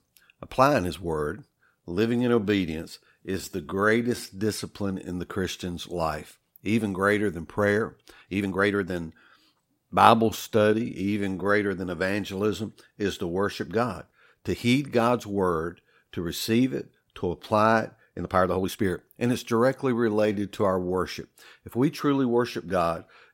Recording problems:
uneven, jittery; strongly; from 1.5 to 21 s

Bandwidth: 16 kHz